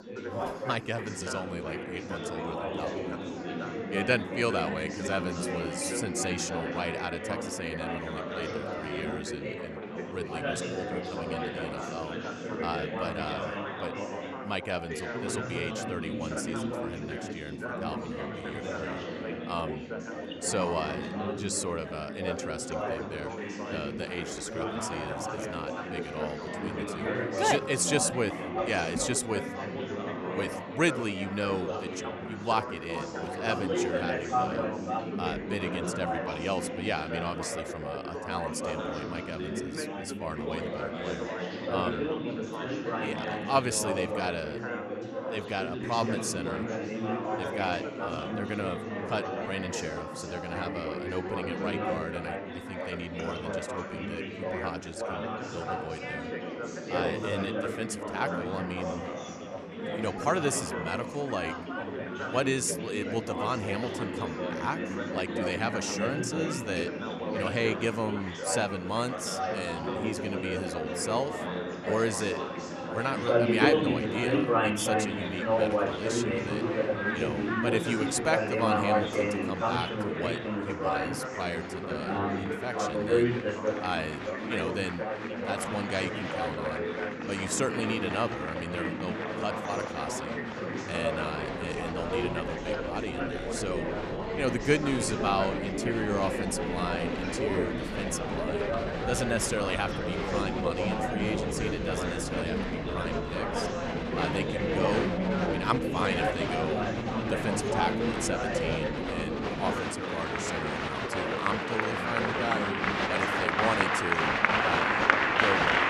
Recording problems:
chatter from many people; very loud; throughout; 2 dB above the speech

